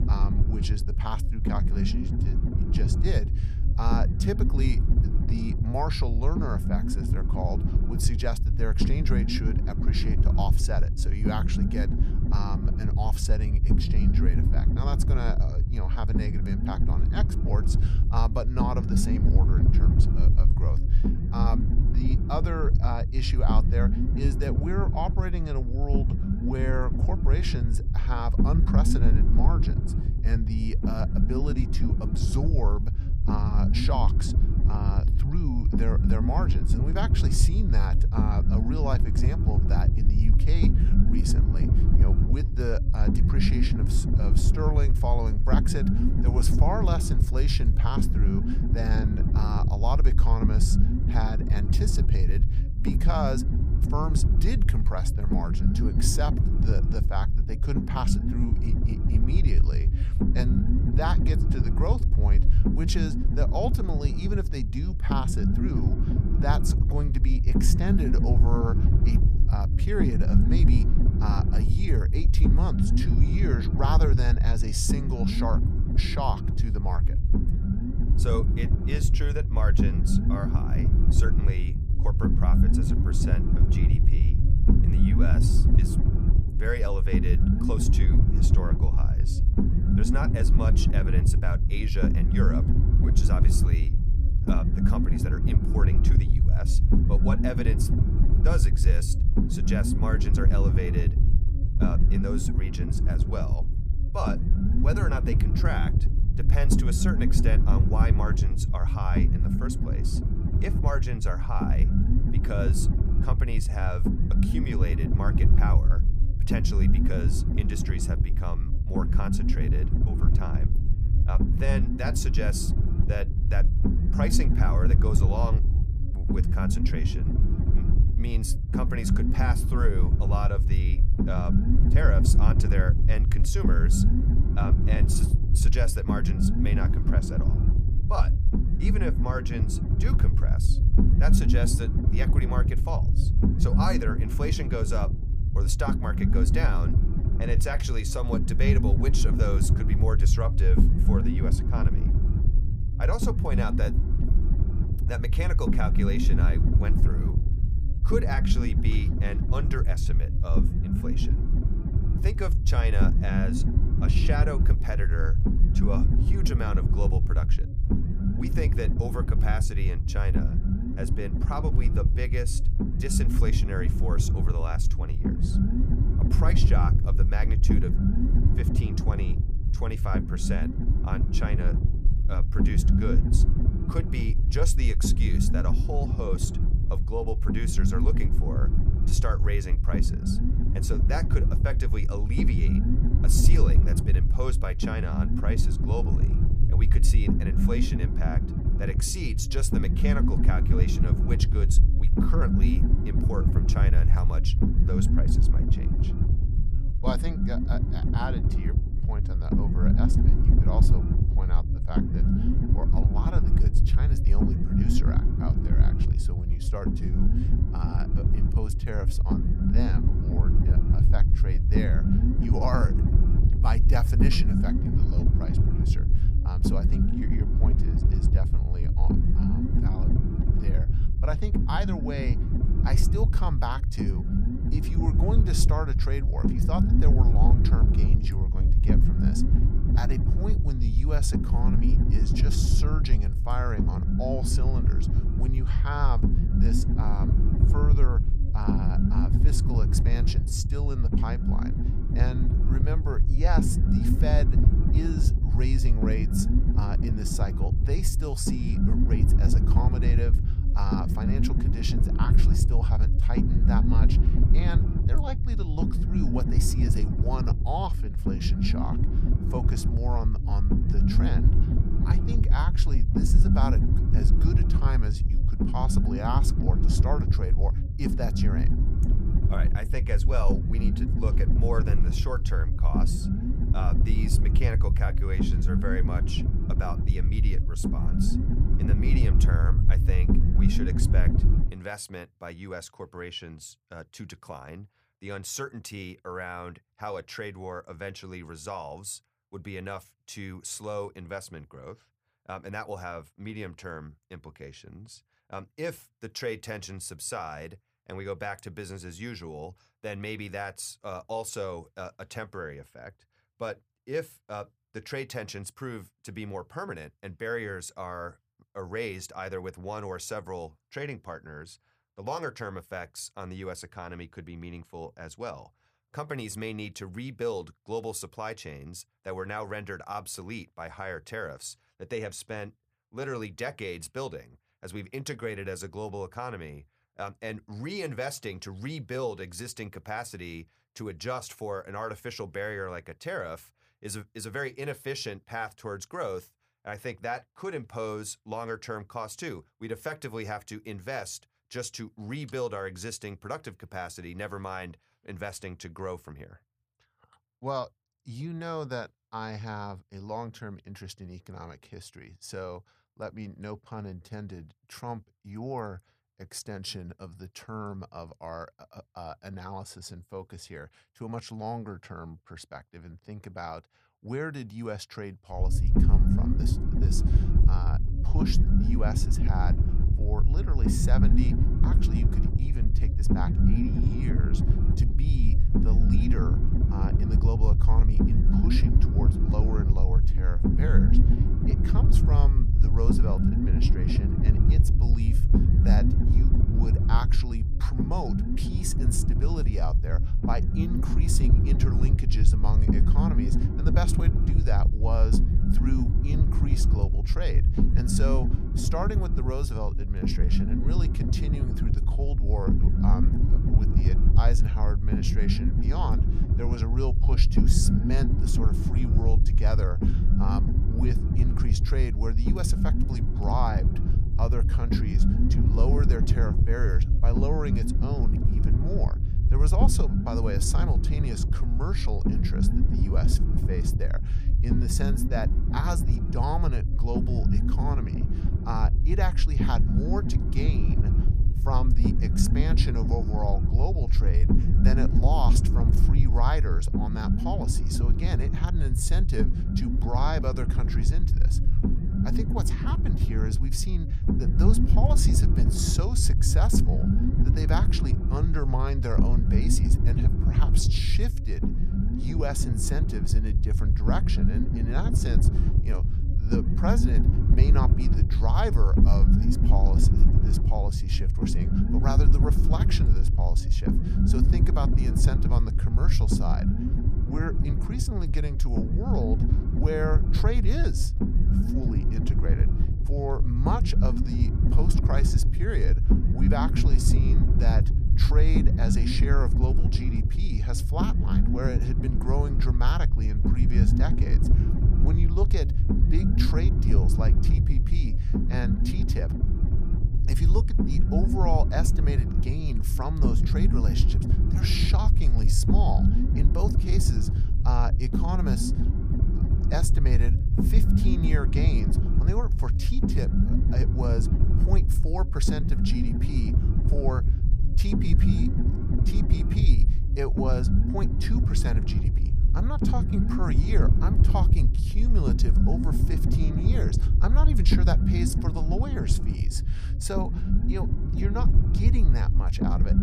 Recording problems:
low rumble; loud; until 4:52 and from 6:16 on; 2 dB below the speech

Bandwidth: 15 kHz